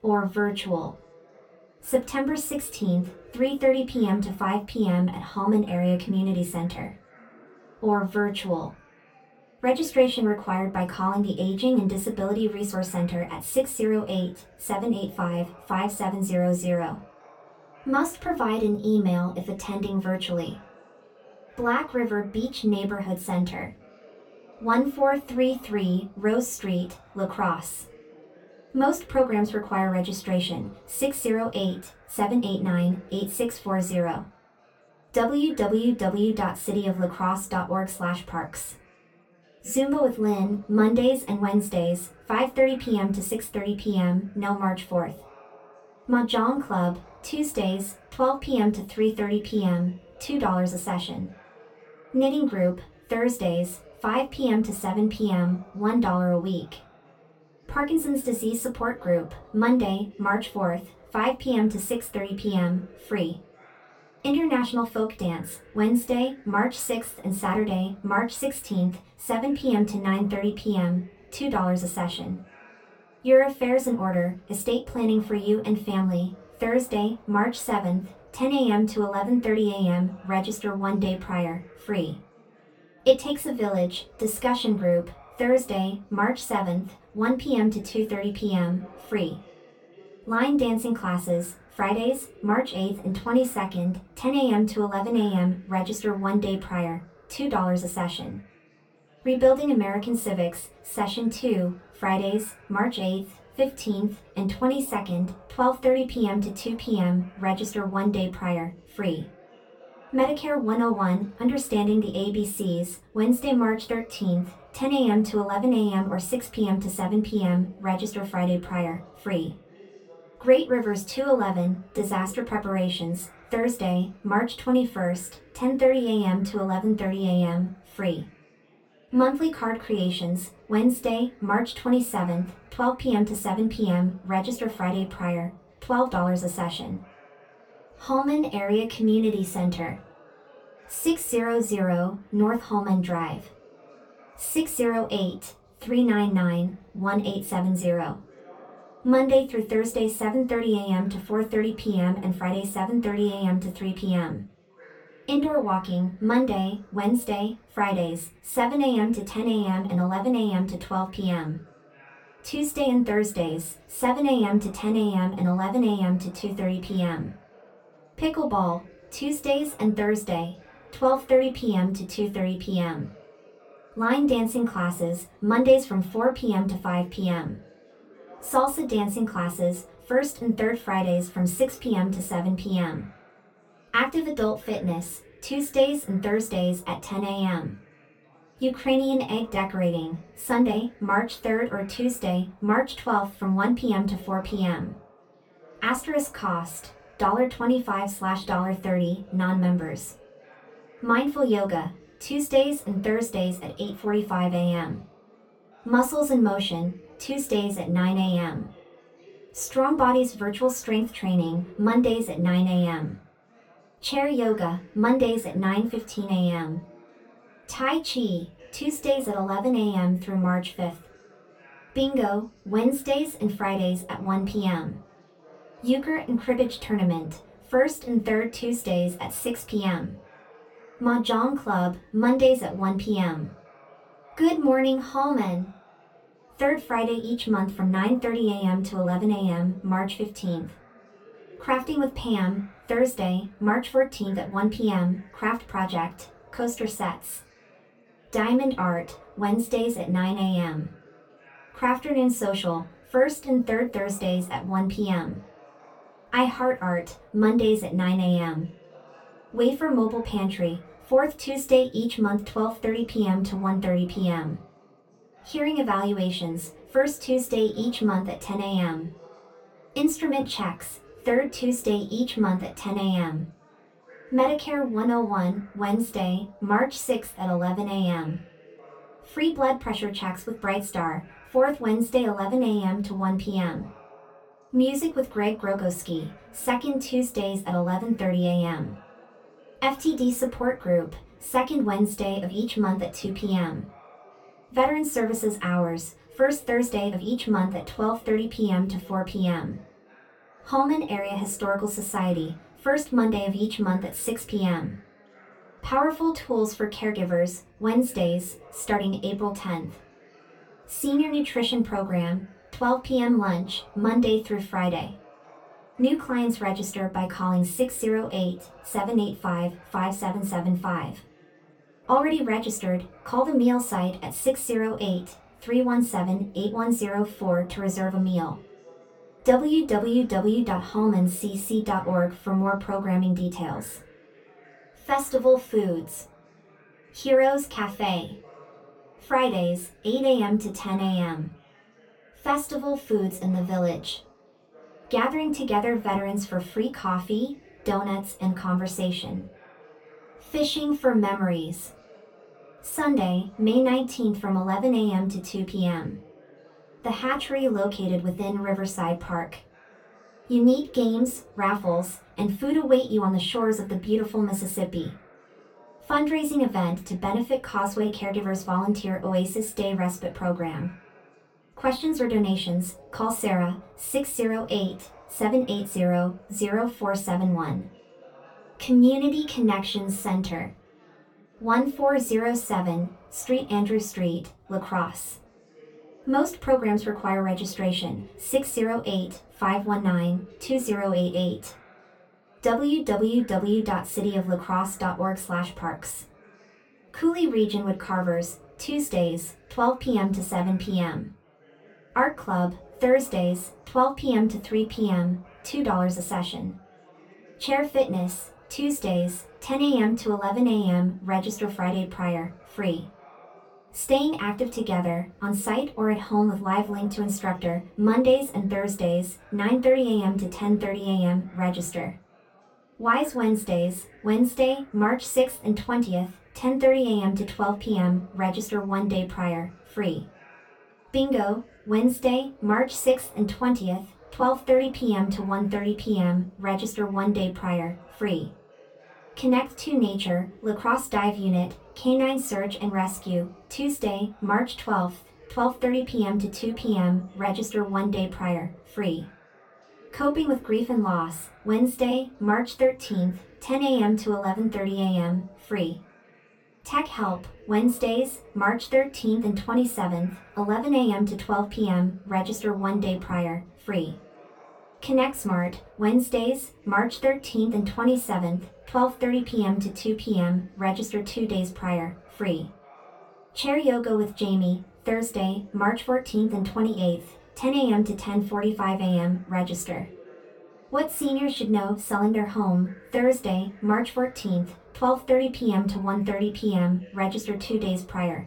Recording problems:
off-mic speech; far
room echo; very slight; dies away in 0.2 s
chatter from many people; faint; throughout; 25 dB below the speech

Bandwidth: 17.5 kHz